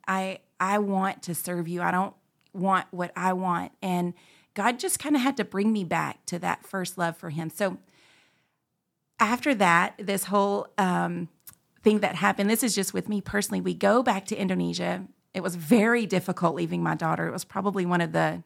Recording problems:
none

